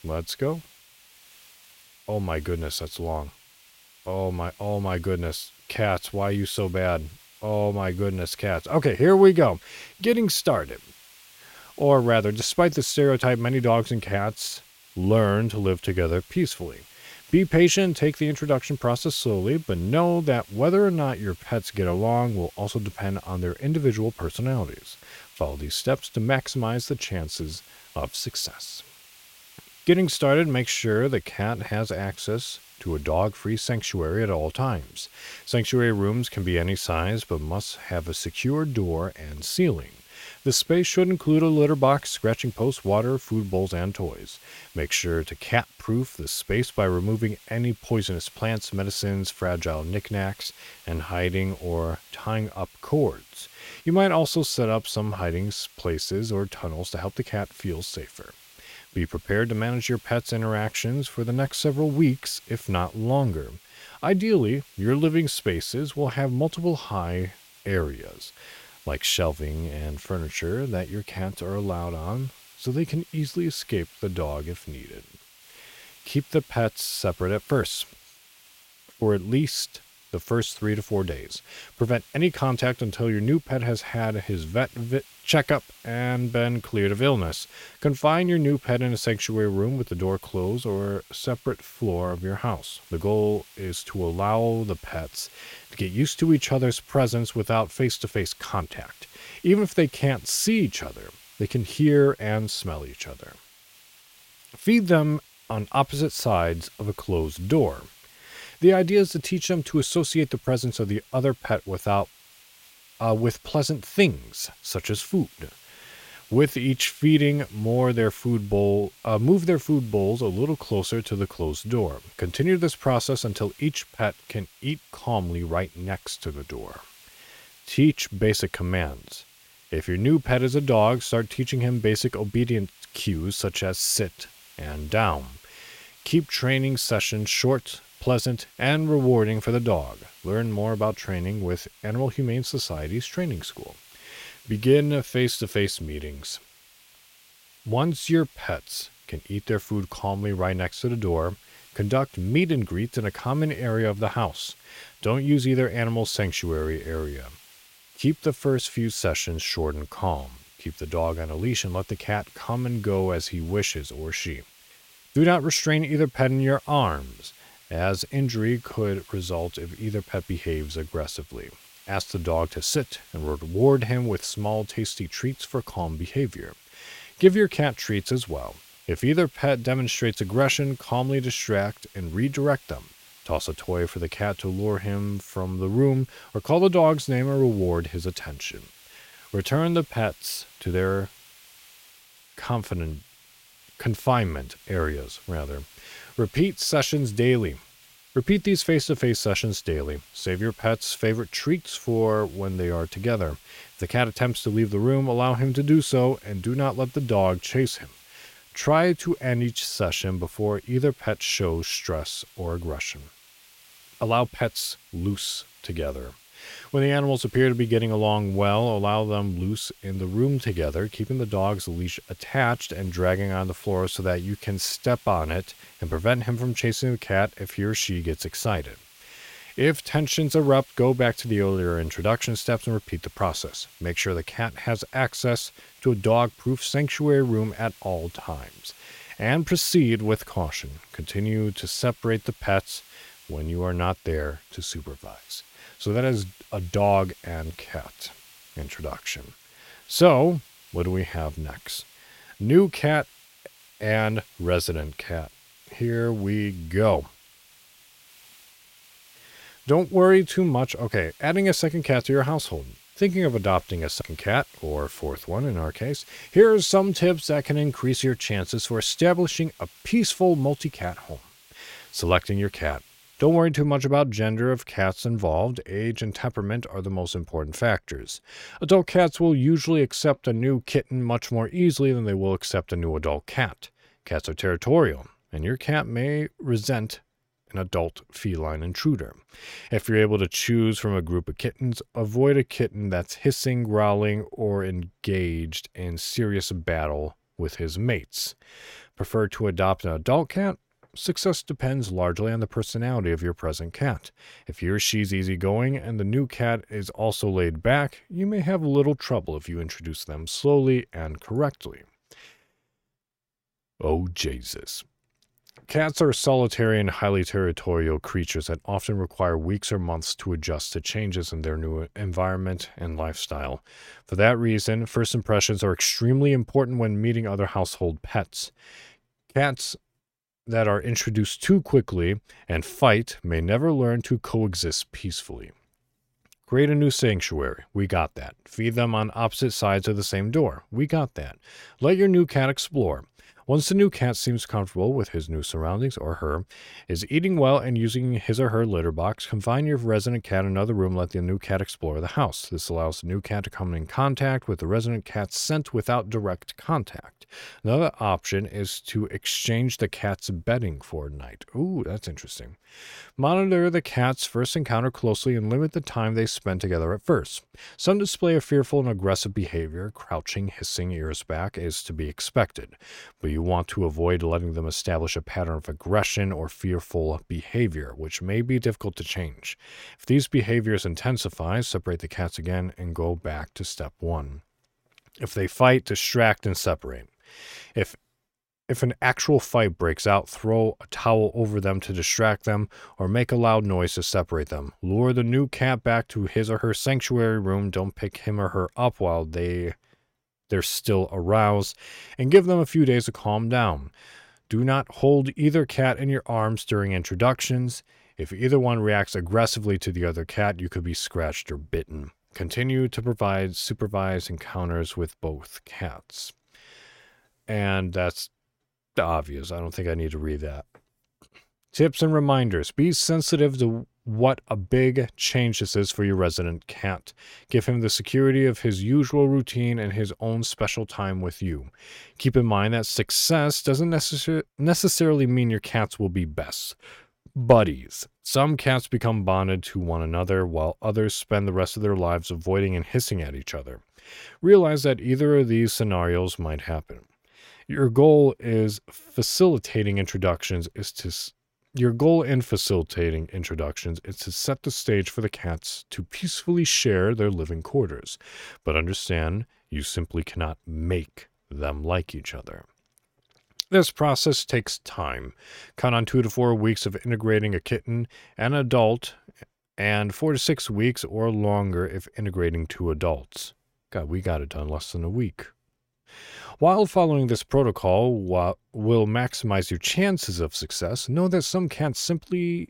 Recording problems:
hiss; faint; until 4:33; 25 dB below the speech

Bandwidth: 16.5 kHz